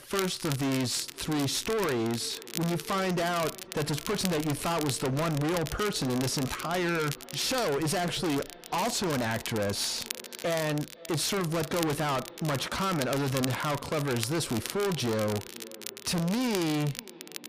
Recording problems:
distortion; heavy; 32% of the sound clipped
echo of what is said; faint; throughout; 510 ms later, 20 dB below the speech
crackle, like an old record; noticeable; 10 dB below the speech

